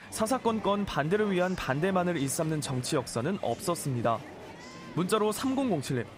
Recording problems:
murmuring crowd; noticeable; throughout; 15 dB below the speech

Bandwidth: 15.5 kHz